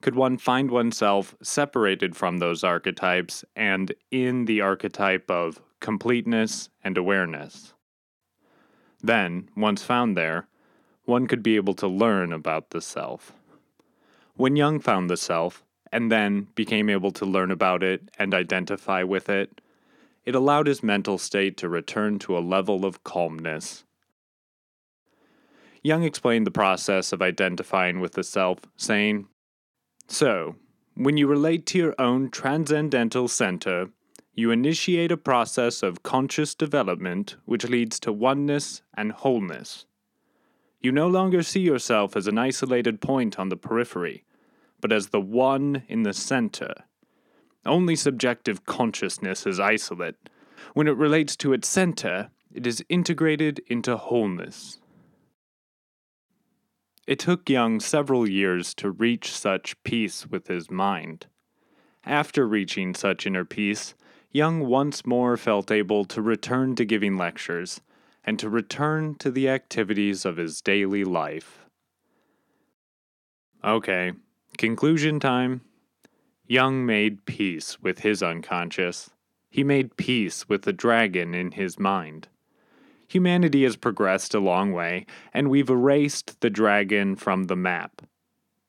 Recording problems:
none

